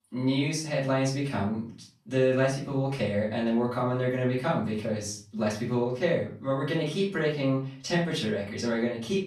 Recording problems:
off-mic speech; far
room echo; noticeable; dies away in 0.4 s

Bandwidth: 13.5 kHz